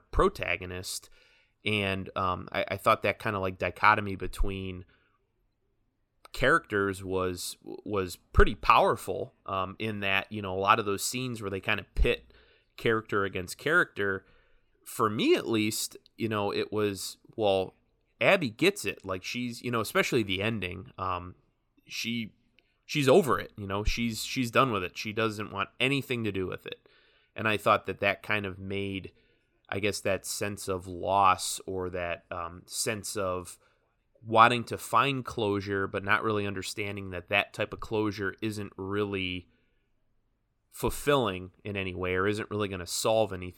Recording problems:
none

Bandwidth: 17.5 kHz